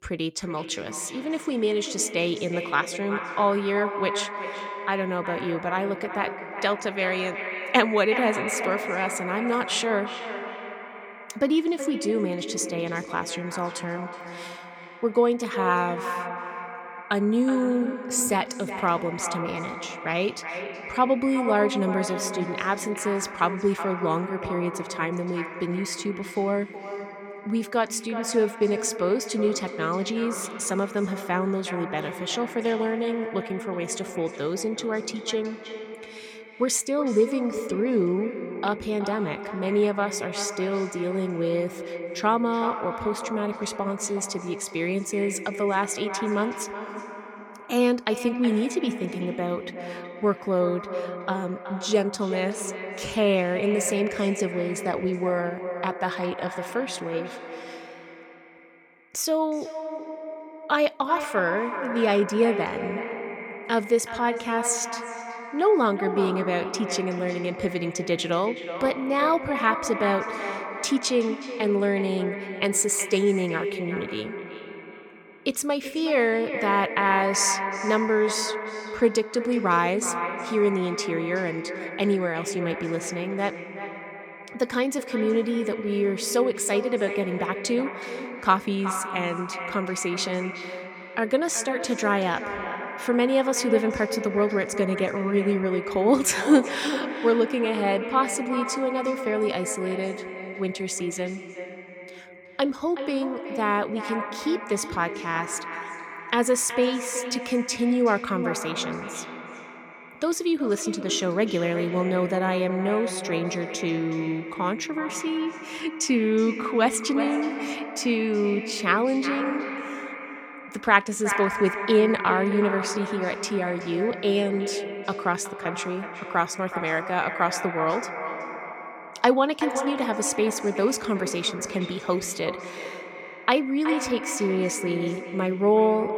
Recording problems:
echo of what is said; strong; throughout; 370 ms later, 8 dB below the speech

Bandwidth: 18 kHz